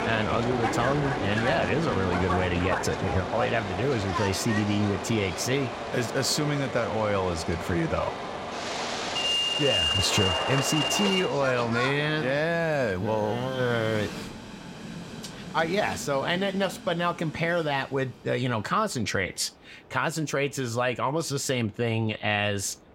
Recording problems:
train or aircraft noise; loud; throughout; 3 dB below the speech

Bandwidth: 16 kHz